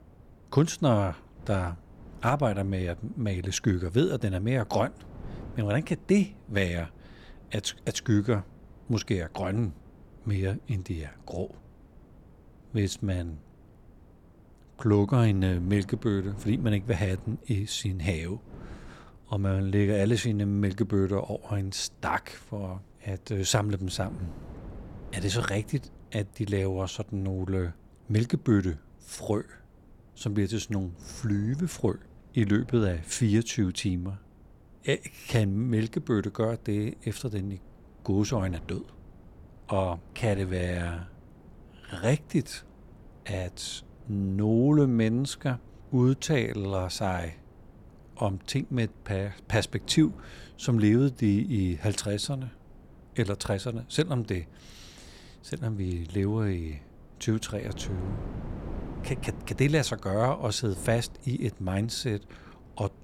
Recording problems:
wind noise on the microphone; occasional gusts; 25 dB below the speech

